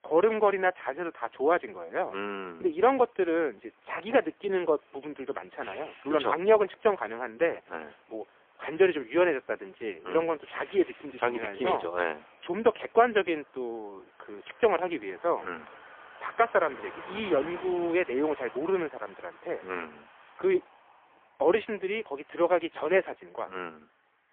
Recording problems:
phone-call audio; poor line; nothing above 3.5 kHz
traffic noise; faint; throughout; 20 dB below the speech

